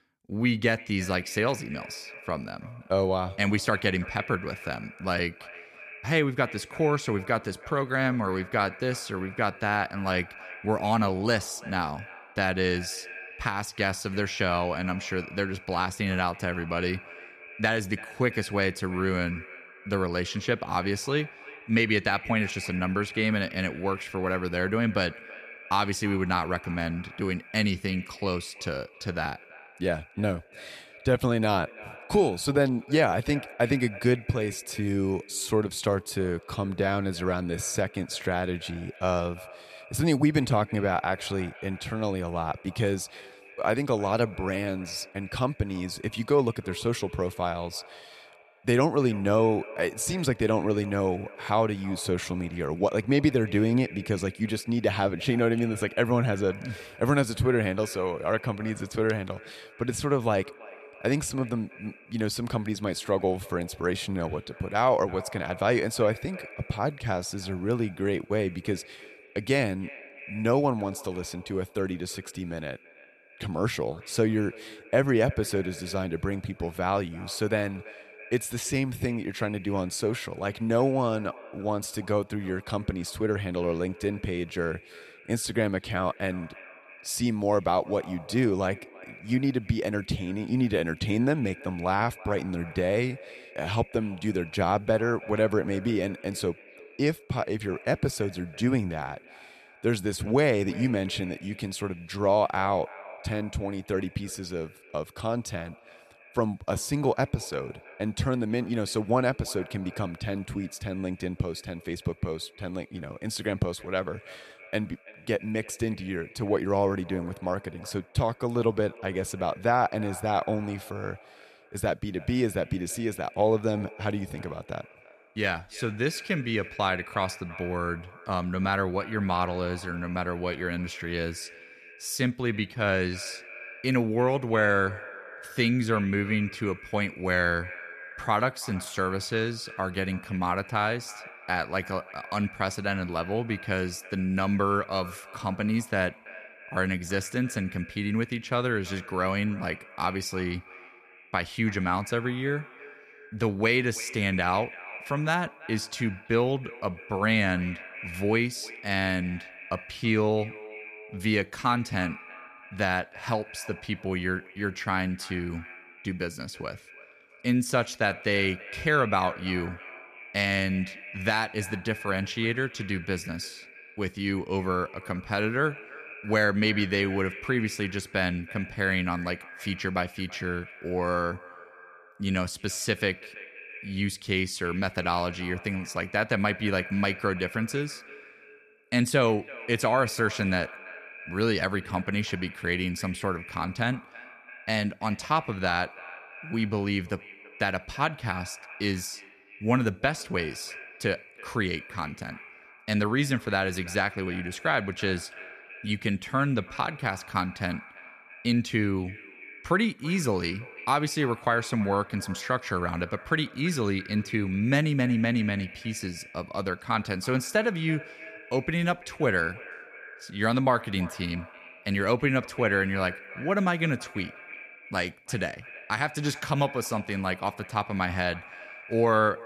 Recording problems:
echo of what is said; noticeable; throughout; 330 ms later, 15 dB below the speech

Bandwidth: 14 kHz